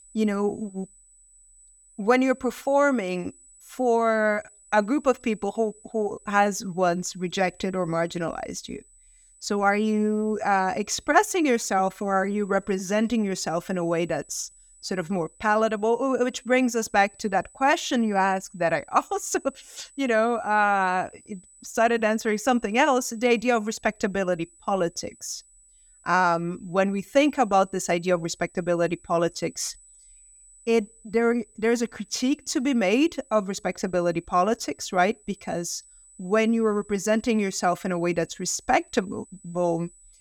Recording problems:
high-pitched whine; faint; throughout; 8 kHz, 25 dB below the speech

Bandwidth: 17.5 kHz